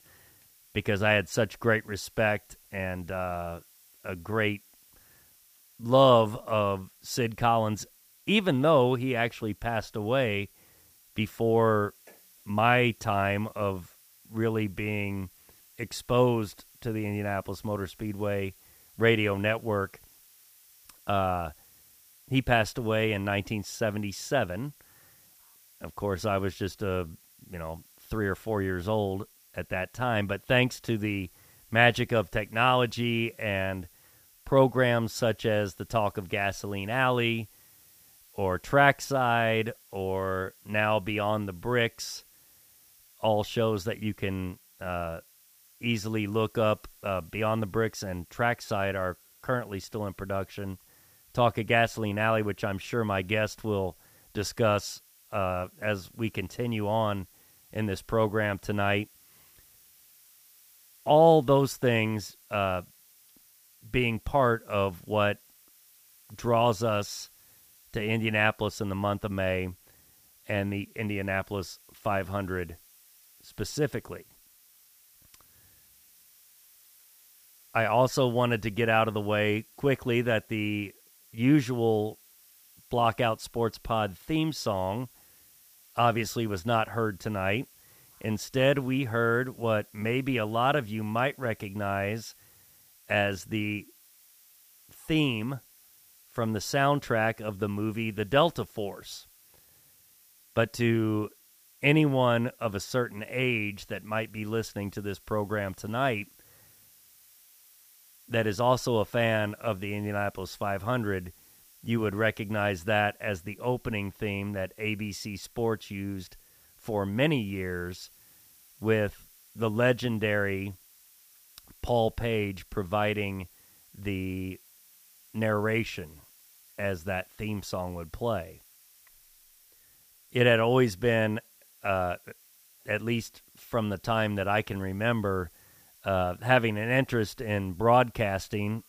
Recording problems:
hiss; faint; throughout; 25 dB below the speech

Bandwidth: 15 kHz